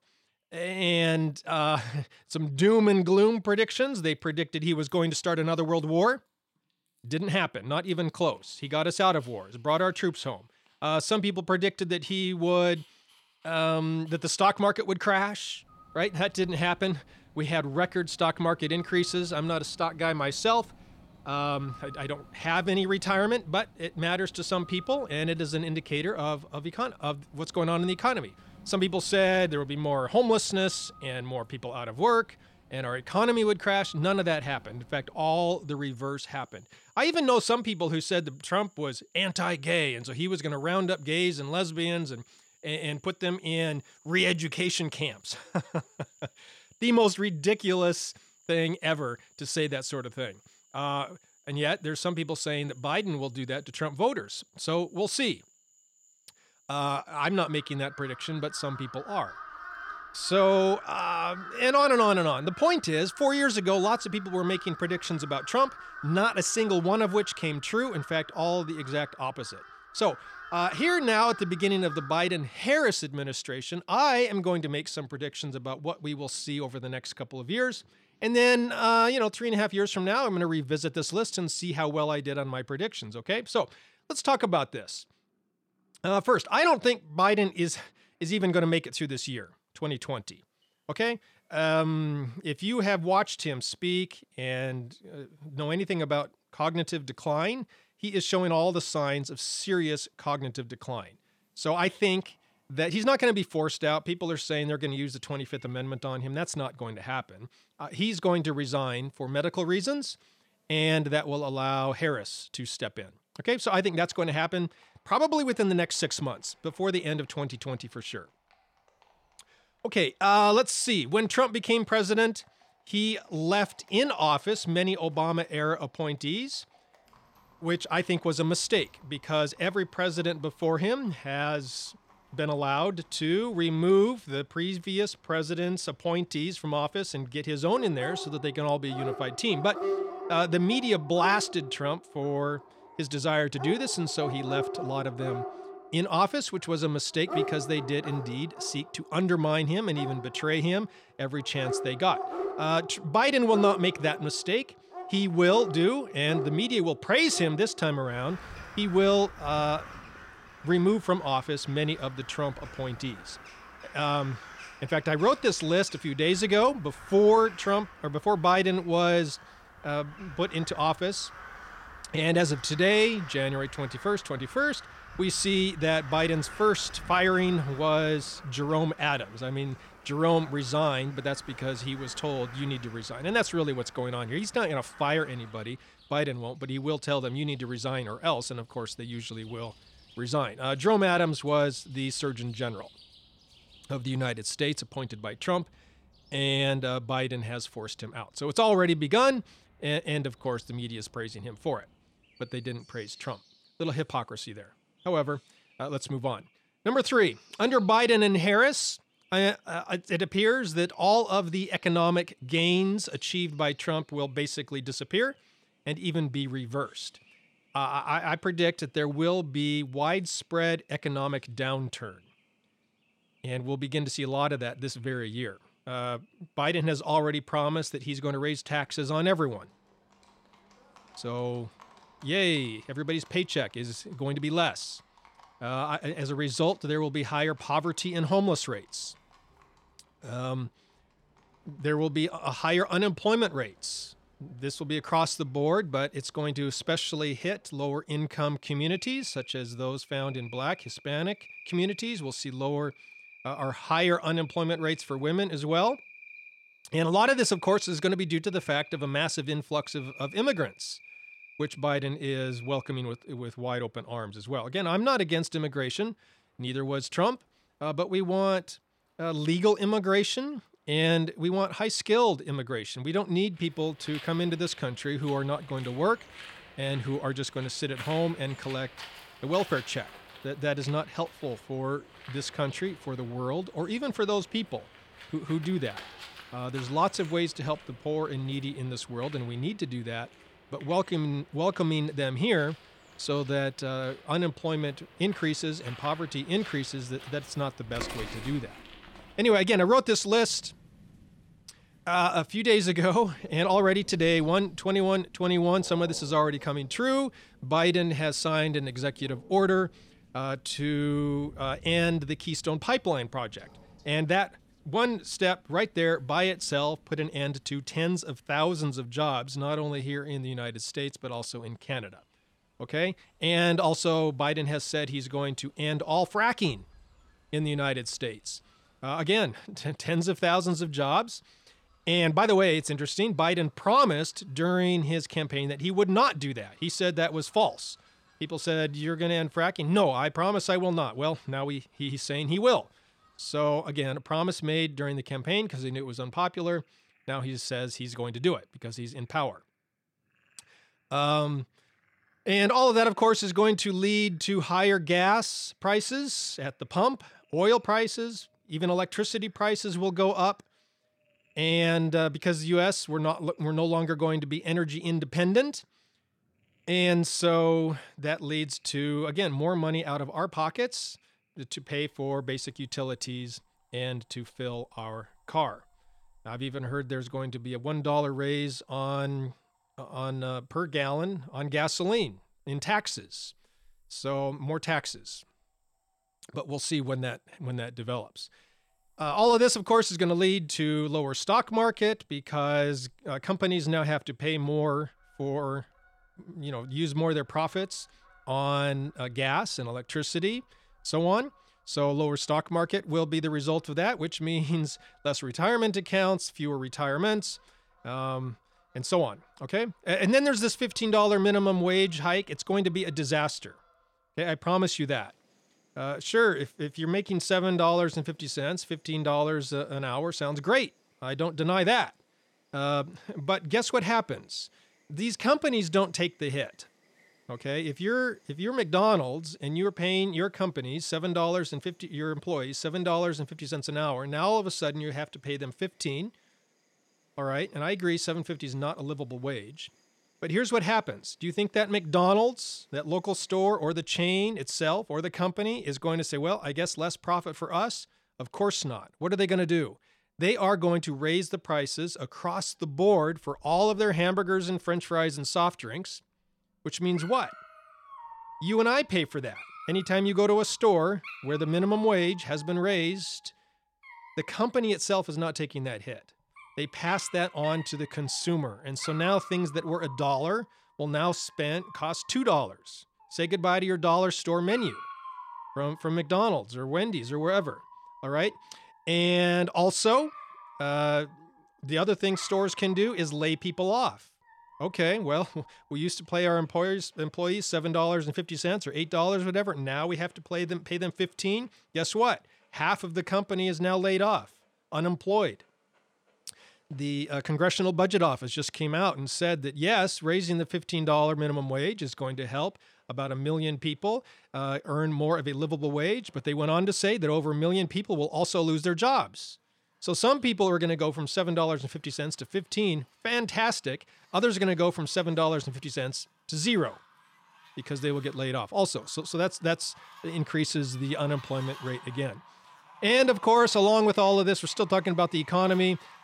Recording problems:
animal sounds; noticeable; throughout; 15 dB below the speech

